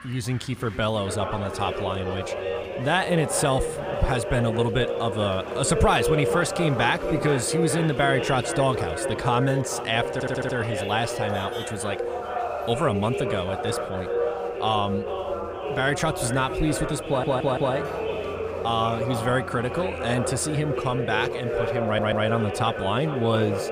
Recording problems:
echo of what is said; strong; throughout; 440 ms later, 6 dB below the speech
voice in the background; loud; throughout; 7 dB below the speech
crowd noise; faint; throughout; 25 dB below the speech
traffic noise; faint; throughout; 20 dB below the speech
audio stuttering; at 10 s, at 17 s and at 22 s
clattering dishes; faint; at 18 s; peak 15 dB below the speech

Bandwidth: 15 kHz